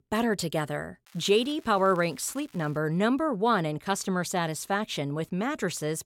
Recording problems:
crackling; faint; from 1 to 3 s; 30 dB below the speech

